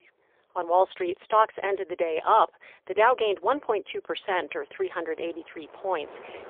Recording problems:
phone-call audio; poor line; nothing above 3.5 kHz
wind in the background; faint; throughout; 25 dB below the speech

